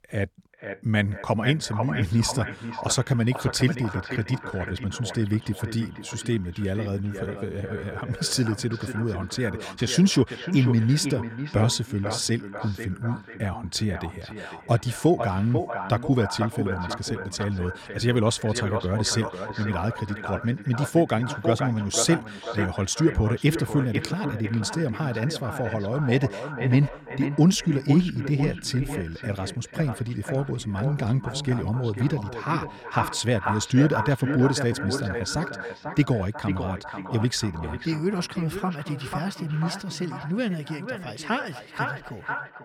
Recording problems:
echo of what is said; strong; throughout; 490 ms later, 8 dB below the speech

